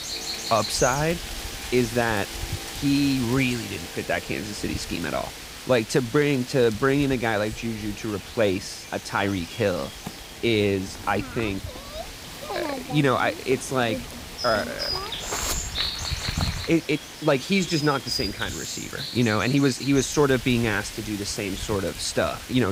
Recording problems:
animal sounds; loud; throughout; 8 dB below the speech
train or aircraft noise; faint; throughout; 25 dB below the speech
abrupt cut into speech; at the end

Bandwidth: 15.5 kHz